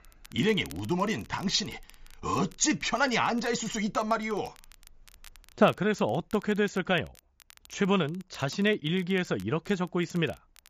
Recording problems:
high frequencies cut off; noticeable; nothing above 7.5 kHz
crackle, like an old record; faint; 25 dB below the speech

